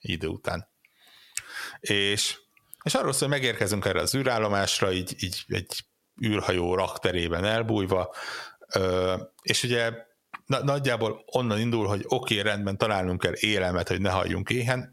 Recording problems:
squashed, flat; heavily

